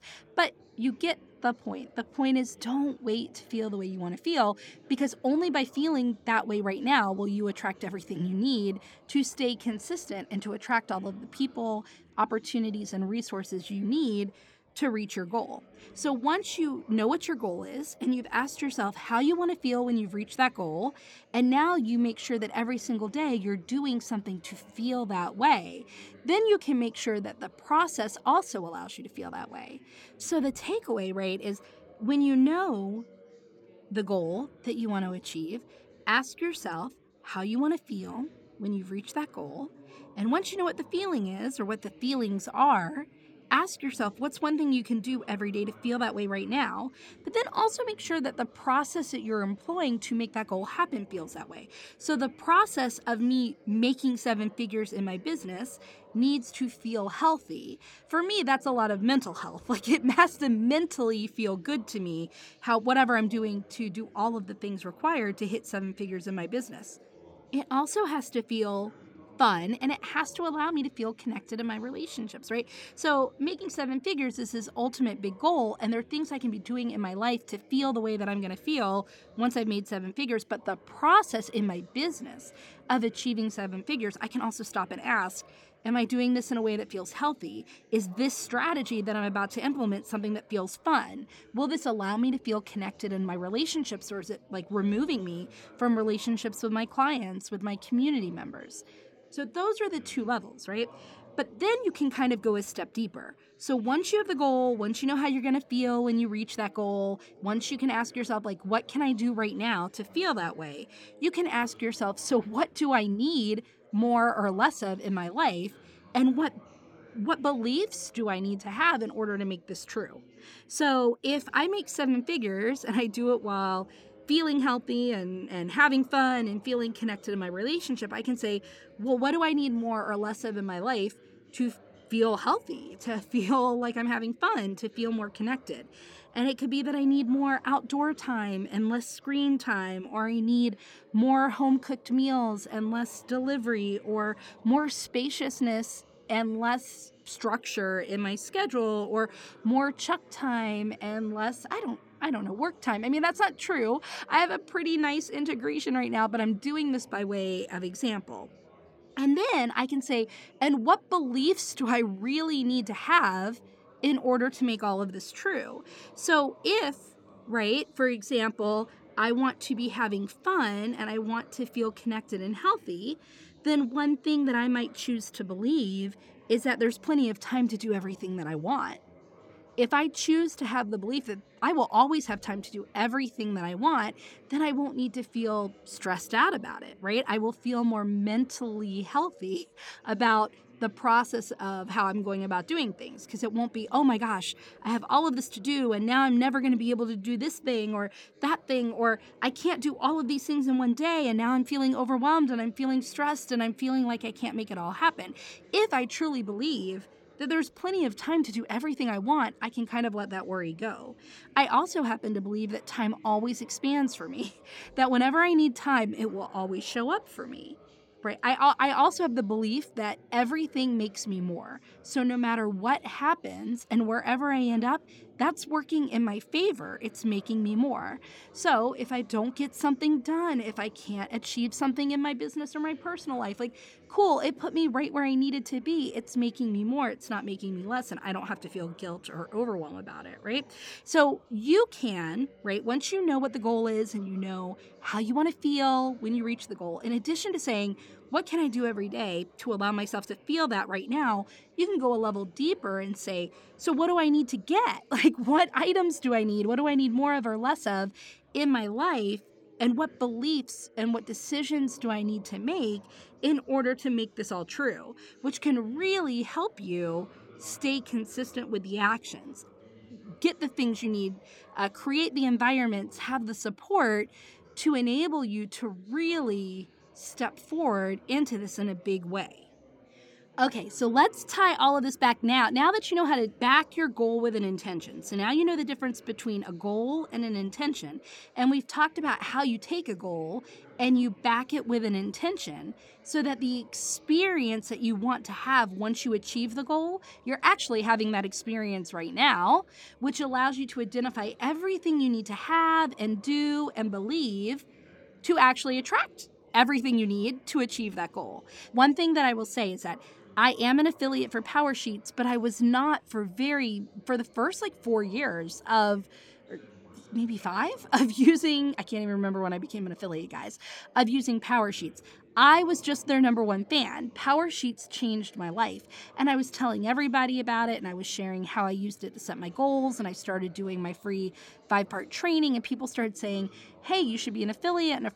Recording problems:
chatter from many people; faint; throughout; 25 dB below the speech

